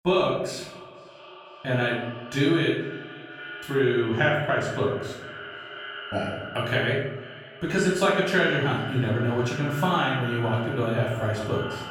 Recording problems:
off-mic speech; far
echo of what is said; noticeable; throughout; 490 ms later, 15 dB below the speech
room echo; noticeable; dies away in 0.9 s

